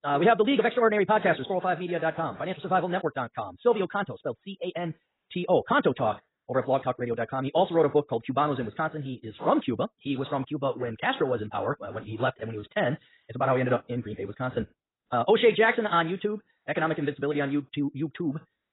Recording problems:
garbled, watery; badly; nothing above 4 kHz
wrong speed, natural pitch; too fast; 1.6 times normal speed

